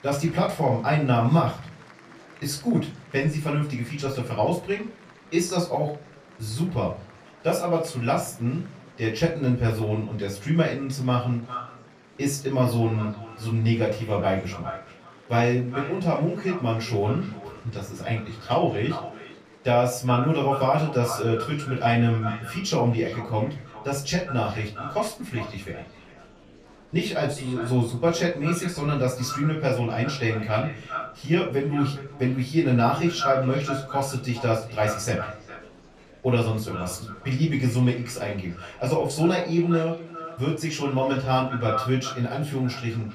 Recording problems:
off-mic speech; far
echo of what is said; noticeable; from 11 s on; 410 ms later, 10 dB below the speech
room echo; slight; dies away in 0.3 s
murmuring crowd; faint; throughout; 25 dB below the speech

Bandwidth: 14.5 kHz